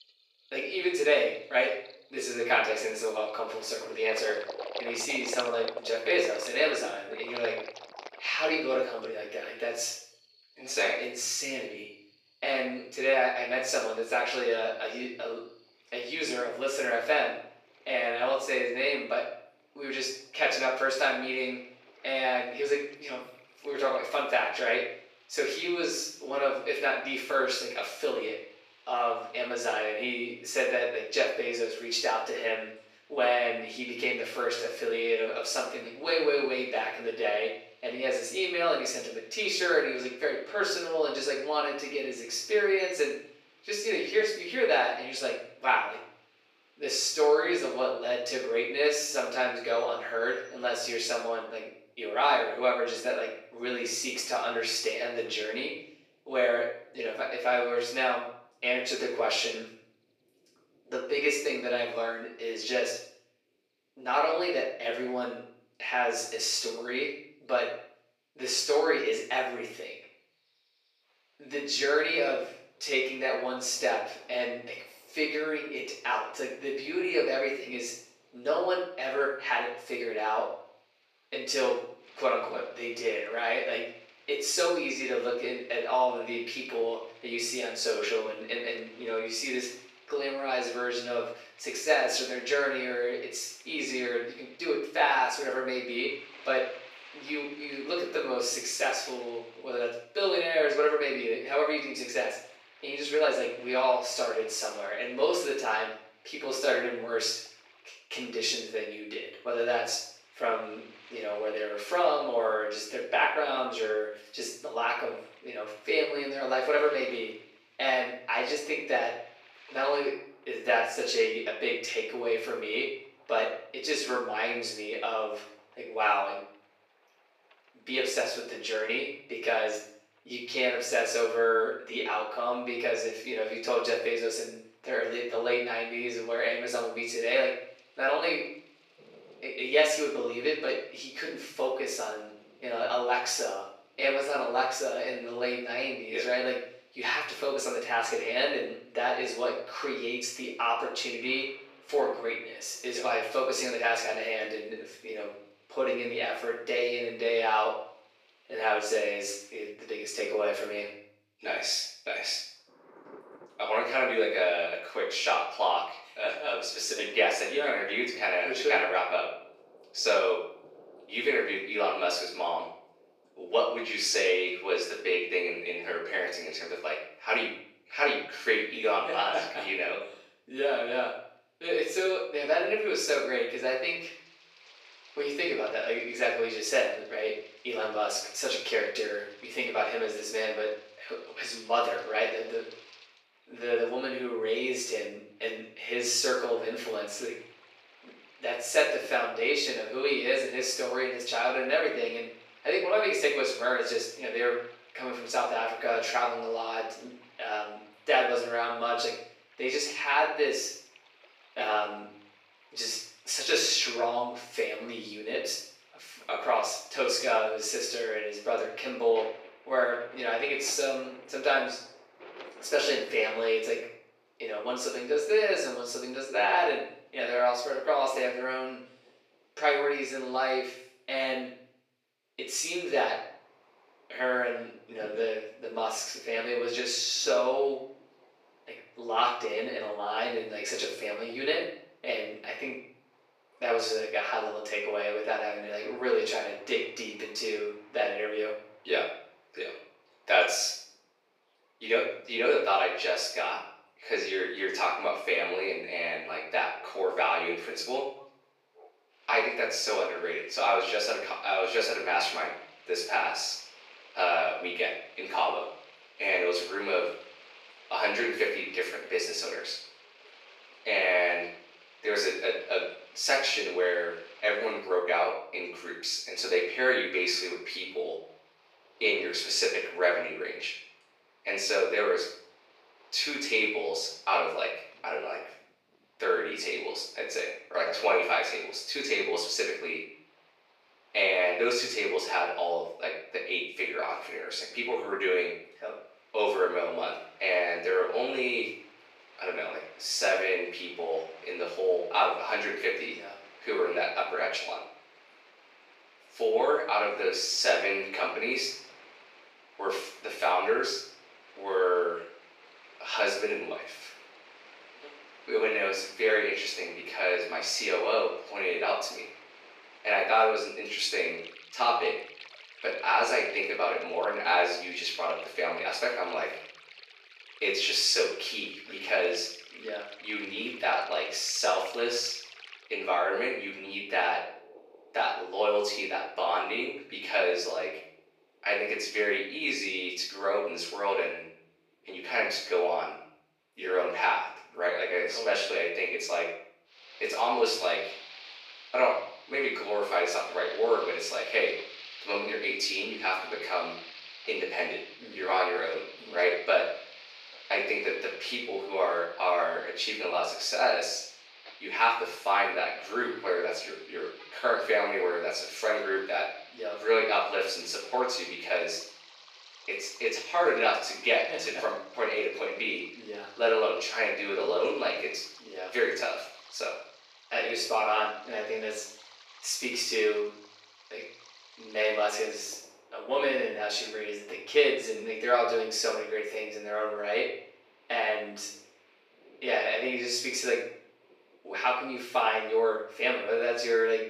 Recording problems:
off-mic speech; far
thin; very; fading below 400 Hz
room echo; noticeable; dies away in 0.6 s
rain or running water; faint; throughout; 20 dB below the speech

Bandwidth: 14.5 kHz